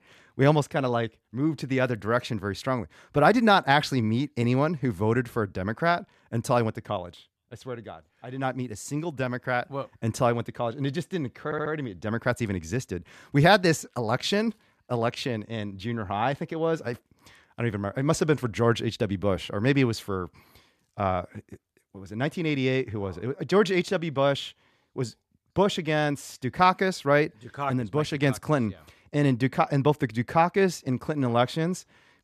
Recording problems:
audio stuttering; at 11 s

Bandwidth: 14.5 kHz